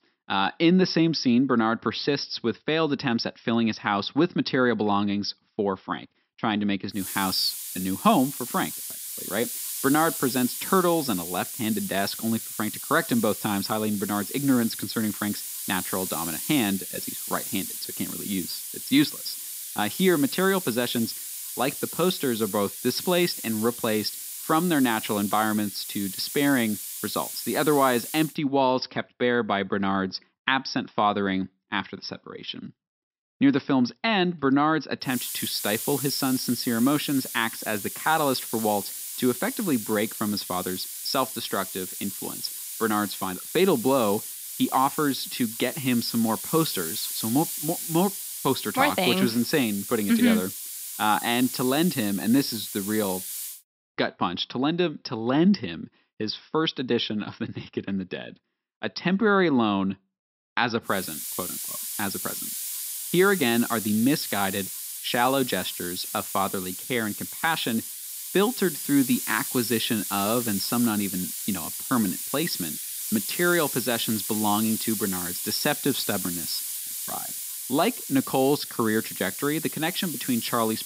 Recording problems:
high frequencies cut off; noticeable; nothing above 5.5 kHz
hiss; loud; from 7 to 28 s, from 35 to 54 s and from 1:01 on; 6 dB below the speech

